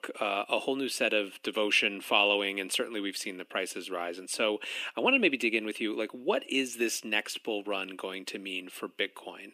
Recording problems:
thin; somewhat; fading below 250 Hz

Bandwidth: 15 kHz